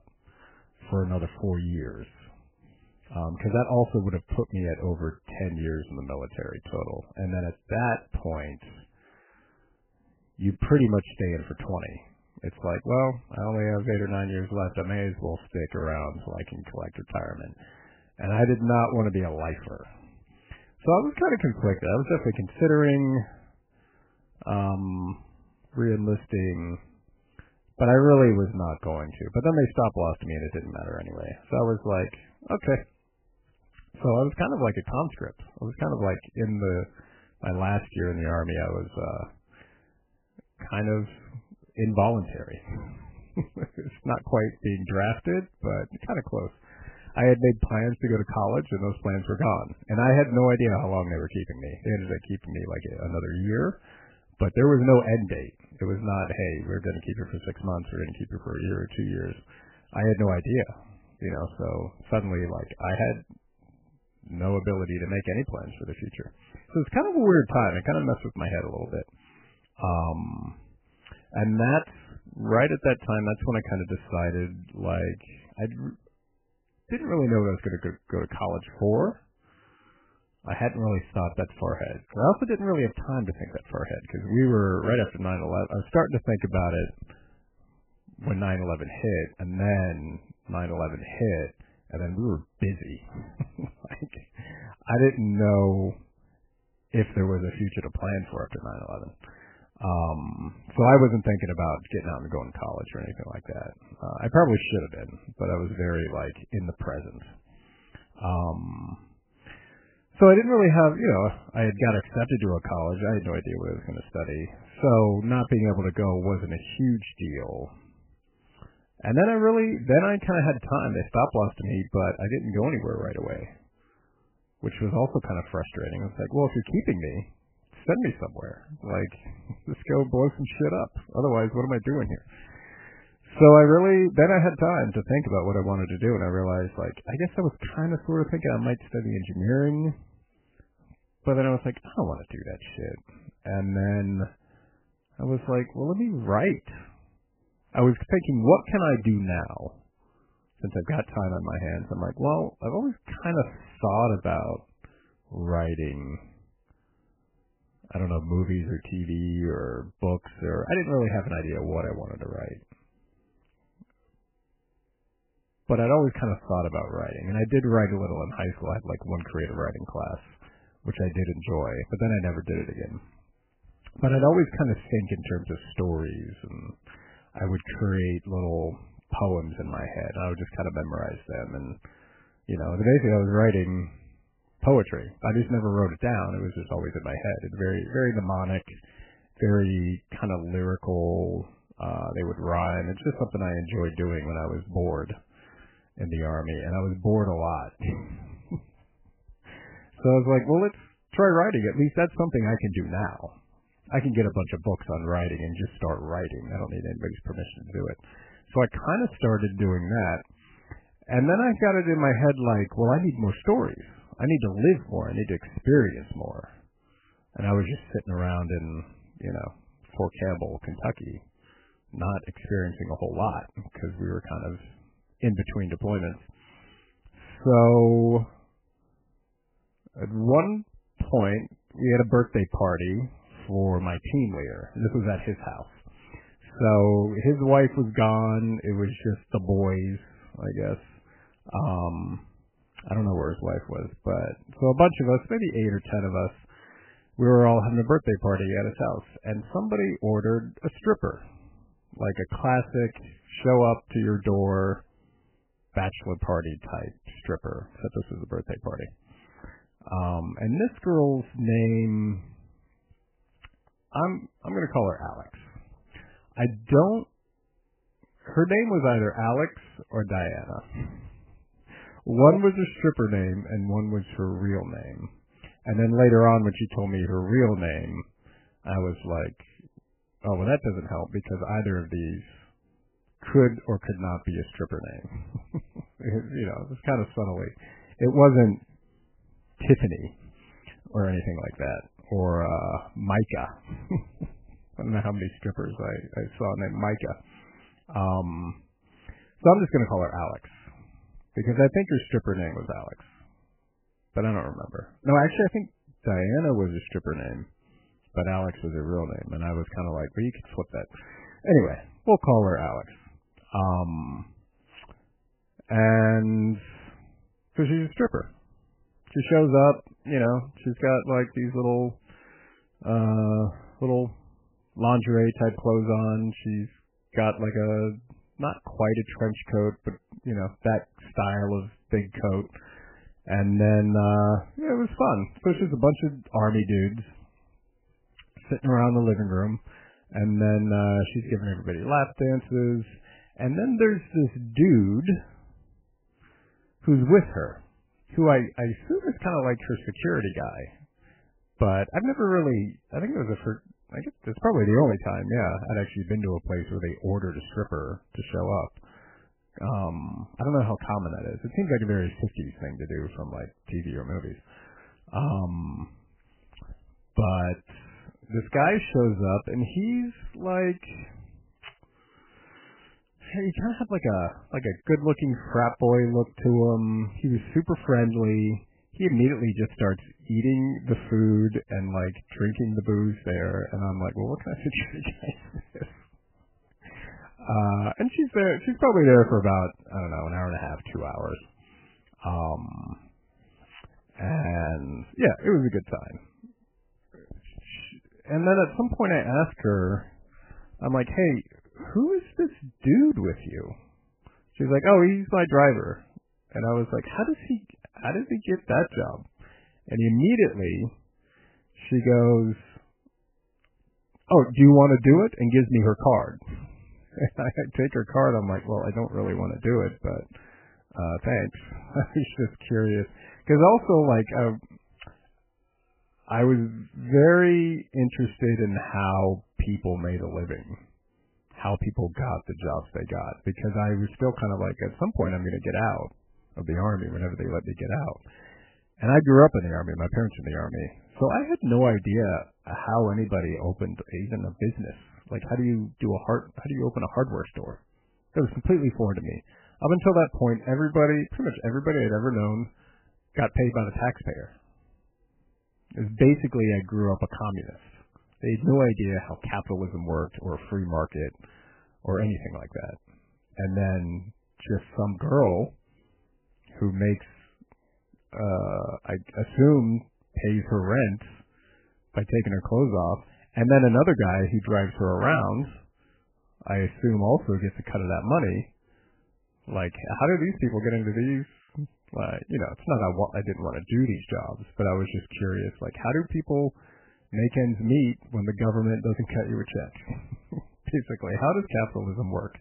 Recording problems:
garbled, watery; badly; nothing above 3 kHz

